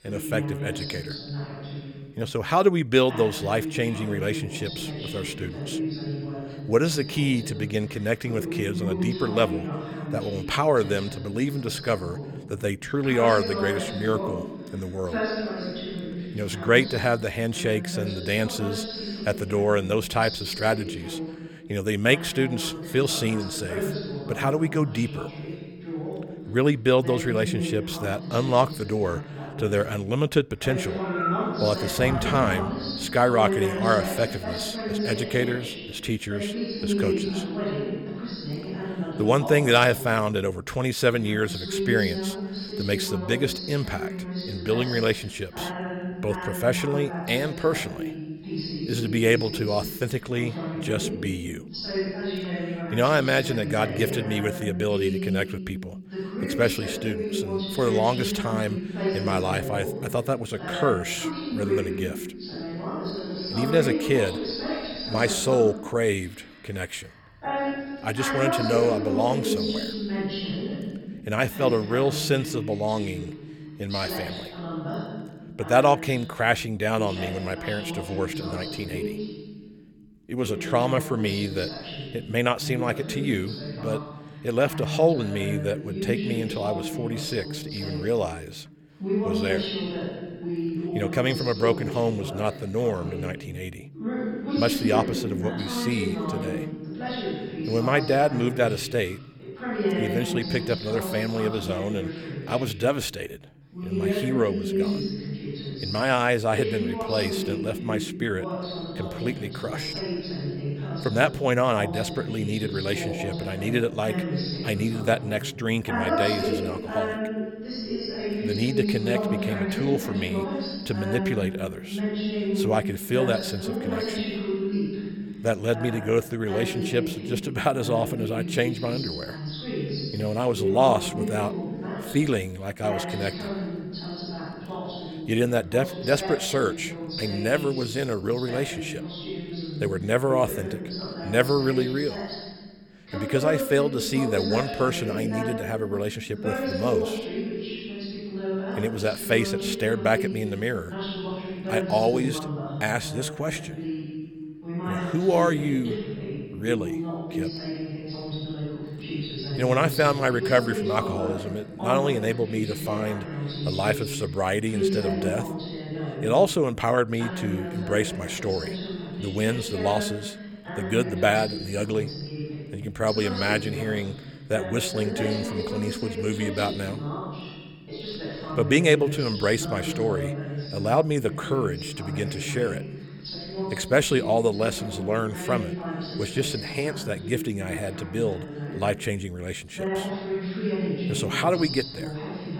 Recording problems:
voice in the background; loud; throughout; 5 dB below the speech

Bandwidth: 18 kHz